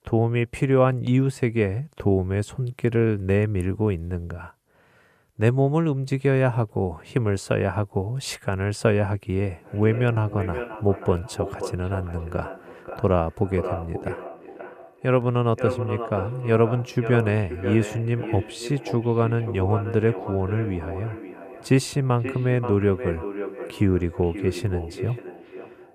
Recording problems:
echo of what is said; strong; from 9.5 s on; 530 ms later, 10 dB below the speech

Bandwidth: 14.5 kHz